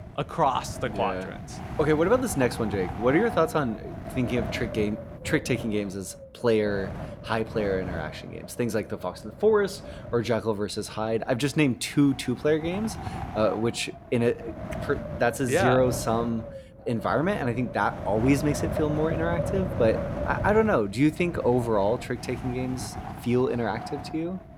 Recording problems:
wind noise on the microphone; occasional gusts; 10 dB below the speech

